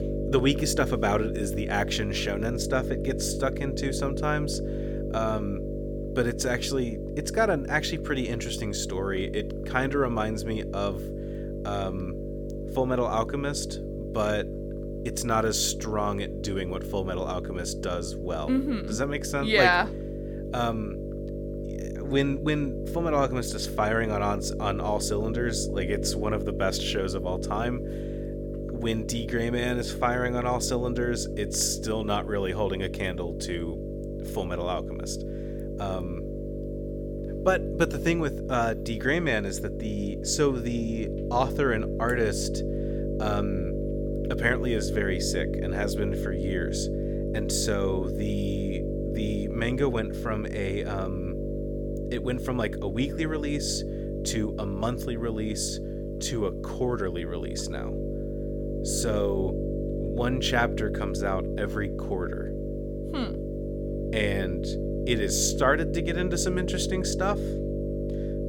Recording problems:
electrical hum; loud; throughout; 50 Hz, 7 dB below the speech

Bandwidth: 17 kHz